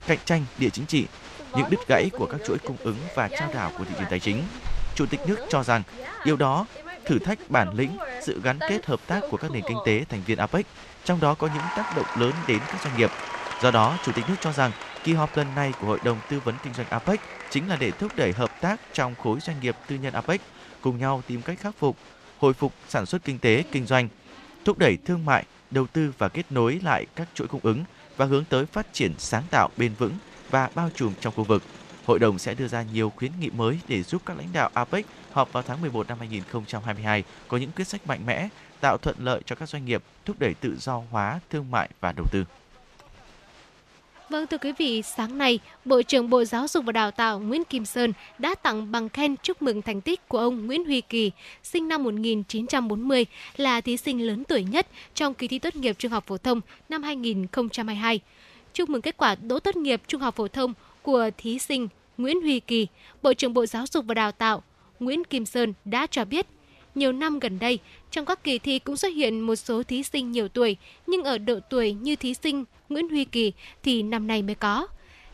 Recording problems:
crowd noise; noticeable; throughout; 15 dB below the speech

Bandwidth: 13.5 kHz